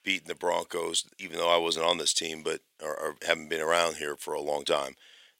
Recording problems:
thin; very; fading below 450 Hz

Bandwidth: 16 kHz